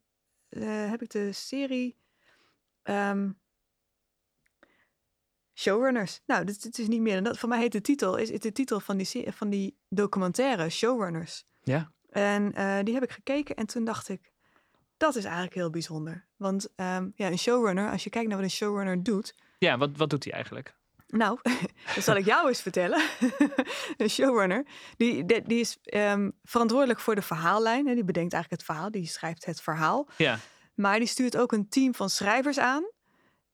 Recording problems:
none

